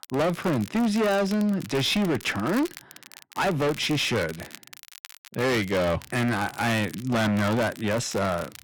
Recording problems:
distortion; heavy; 19% of the sound clipped
crackle, like an old record; noticeable; 20 dB below the speech

